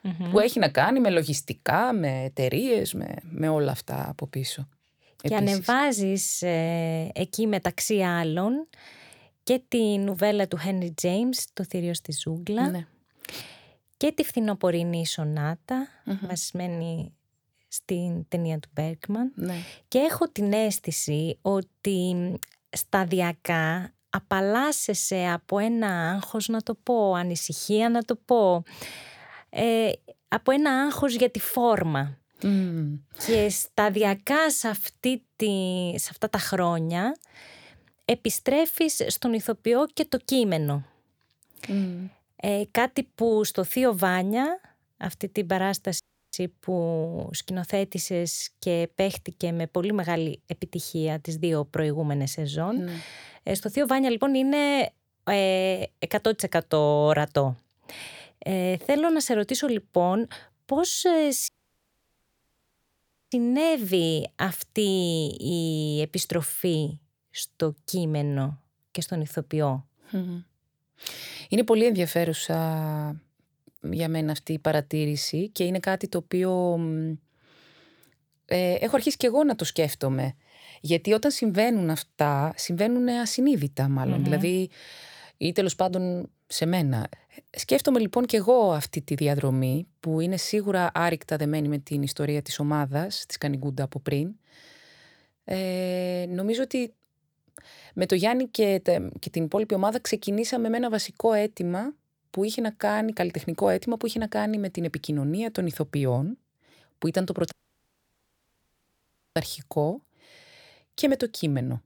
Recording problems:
audio cutting out; at 46 s, at 1:01 for 2 s and at 1:48 for 2 s

